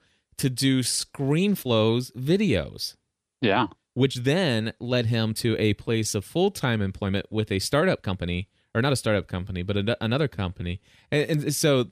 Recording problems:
uneven, jittery; strongly; from 1 to 11 s

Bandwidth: 14.5 kHz